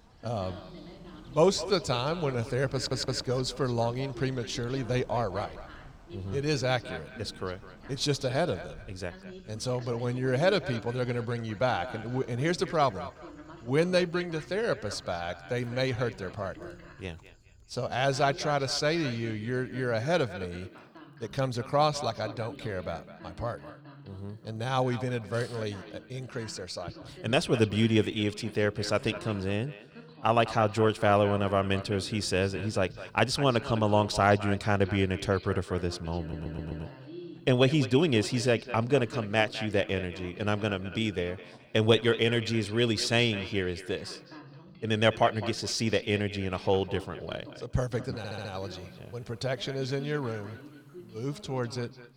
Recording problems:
echo of what is said; noticeable; throughout; 210 ms later, 15 dB below the speech
voice in the background; noticeable; throughout; 20 dB below the speech
animal sounds; faint; throughout; 30 dB below the speech
audio stuttering; at 3 s, at 36 s and at 48 s

